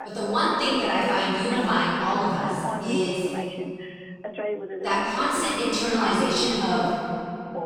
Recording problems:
room echo; strong; dies away in 2.7 s
off-mic speech; far
voice in the background; loud; throughout; 10 dB below the speech

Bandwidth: 16.5 kHz